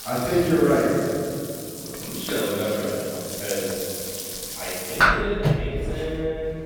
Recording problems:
room echo; strong; dies away in 2.7 s
off-mic speech; far
household noises; loud; throughout; 2 dB below the speech

